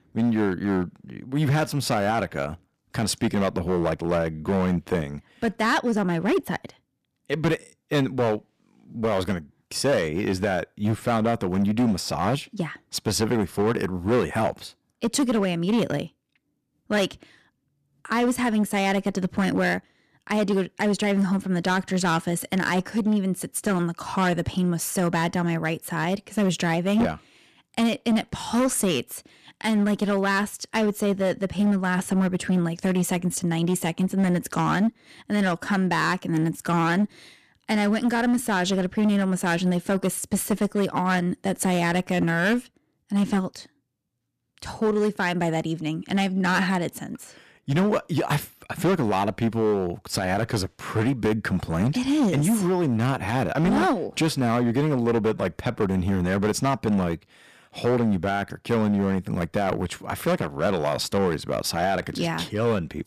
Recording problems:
distortion; slight; 9% of the sound clipped

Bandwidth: 14.5 kHz